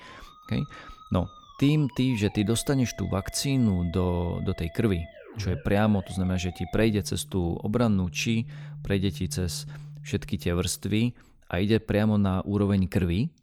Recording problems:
background music; noticeable; until 11 s; 20 dB below the speech

